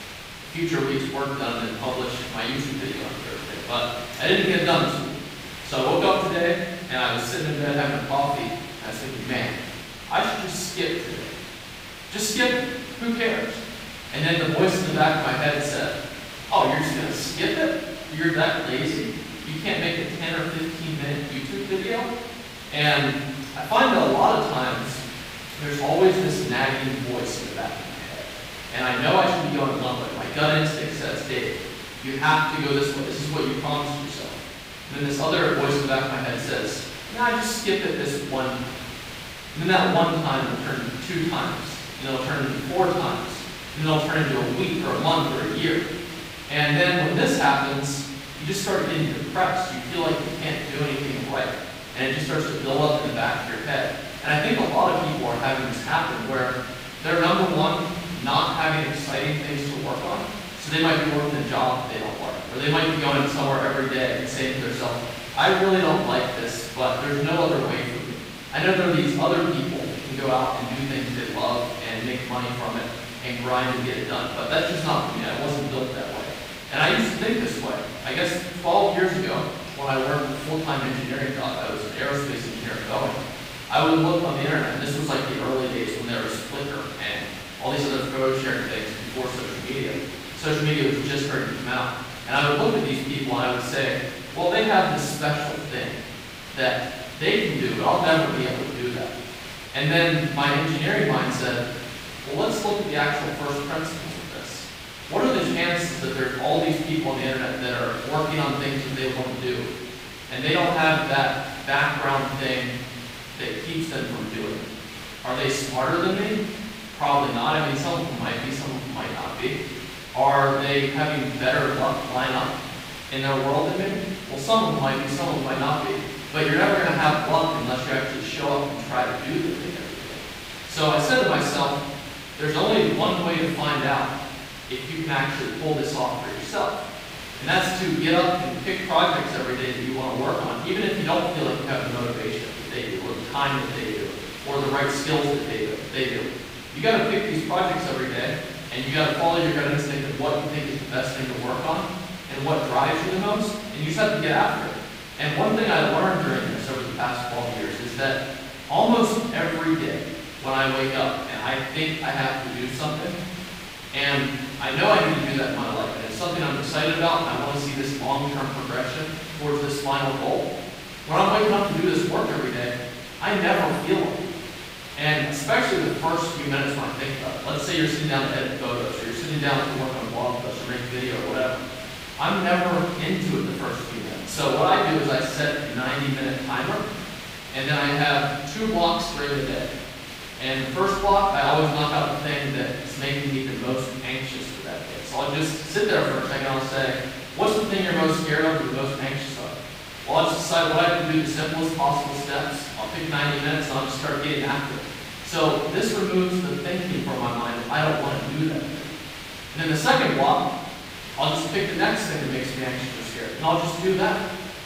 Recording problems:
room echo; strong; dies away in 1.1 s
off-mic speech; far
hiss; noticeable; throughout; 10 dB below the speech

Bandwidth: 15.5 kHz